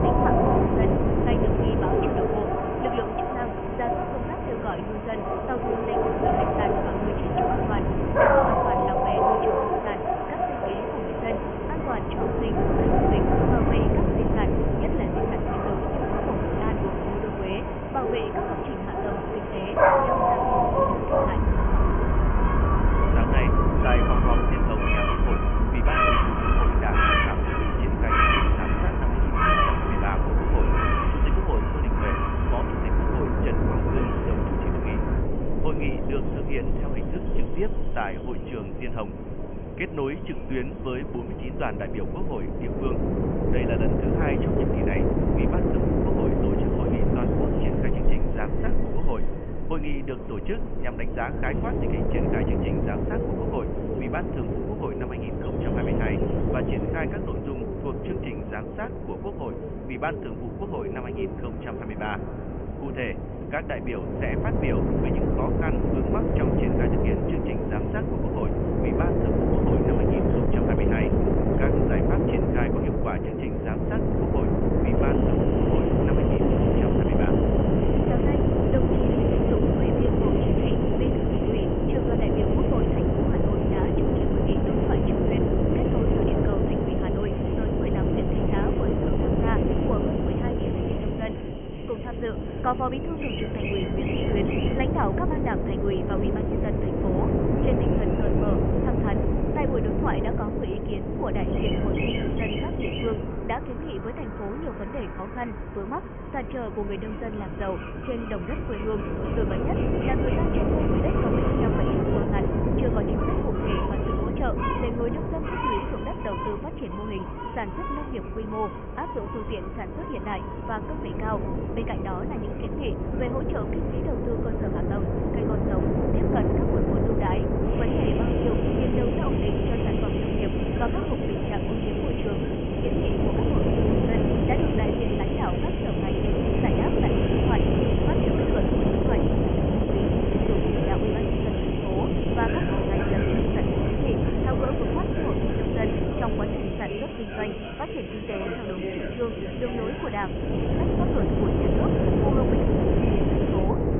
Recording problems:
high frequencies cut off; severe; nothing above 3 kHz
animal sounds; very loud; throughout; 5 dB above the speech
wind noise on the microphone; heavy; 4 dB above the speech

